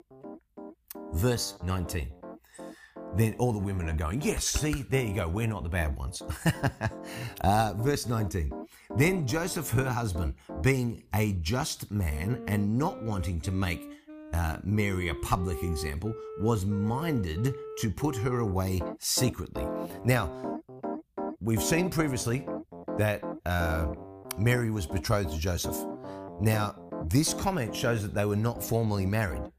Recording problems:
background music; noticeable; throughout; 10 dB below the speech

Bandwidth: 15 kHz